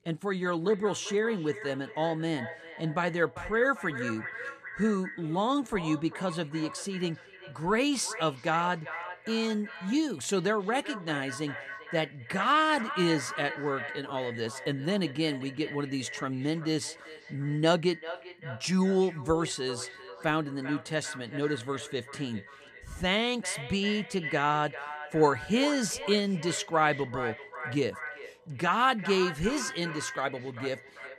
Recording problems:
echo of what is said; strong; throughout; 390 ms later, 10 dB below the speech

